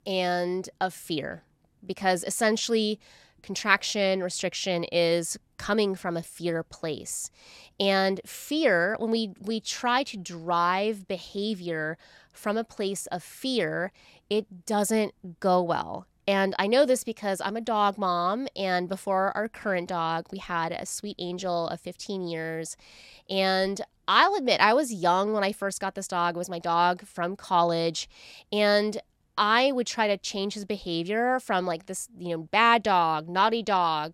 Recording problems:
none

